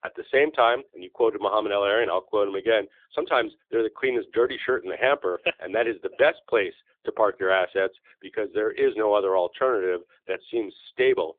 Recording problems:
thin; very; fading below 300 Hz
phone-call audio; nothing above 3.5 kHz

